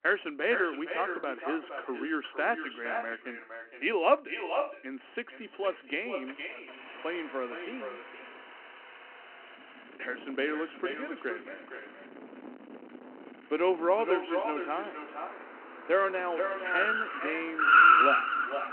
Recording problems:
echo of what is said; strong; throughout; 460 ms later, 6 dB below the speech
phone-call audio
traffic noise; very loud; throughout; 9 dB above the speech

